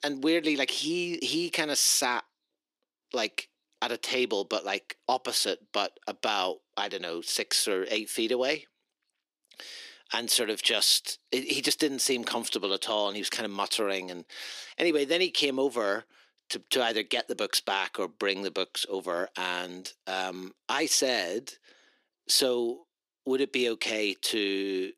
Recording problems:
thin; somewhat; fading below 300 Hz

